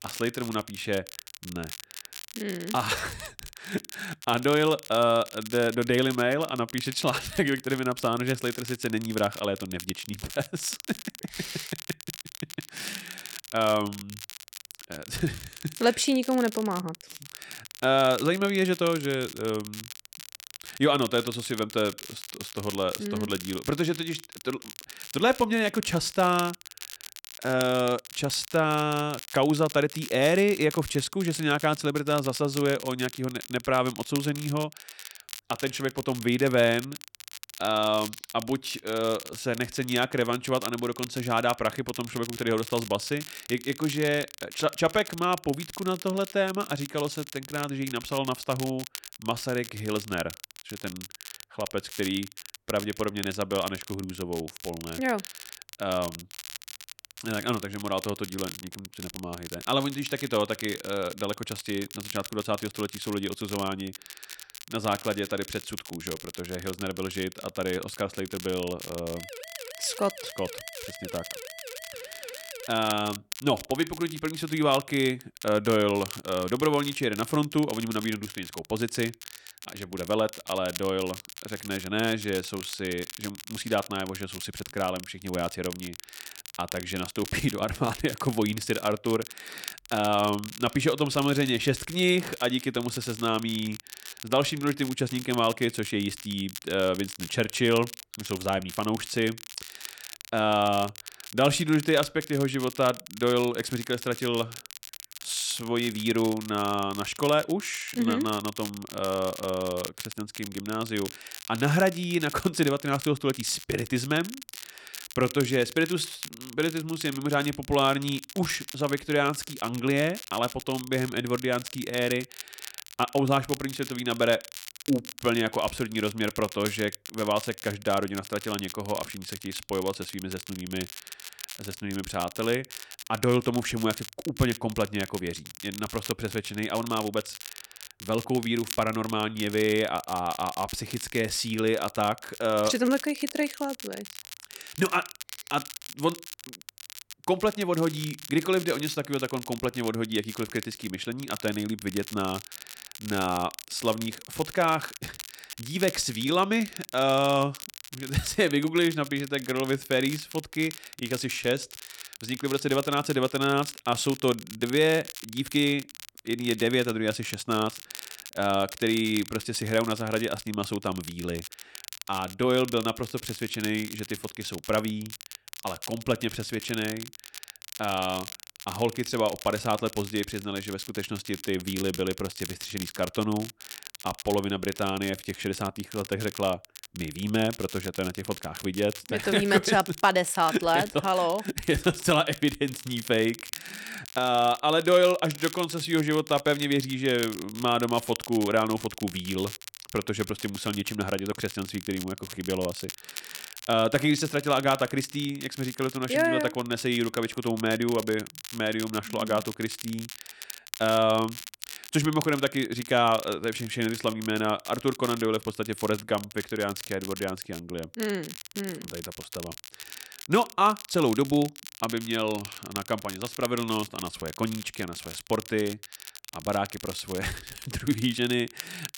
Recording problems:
crackle, like an old record; noticeable; 15 dB below the speech
siren; faint; from 1:09 to 1:13; peak 15 dB below the speech

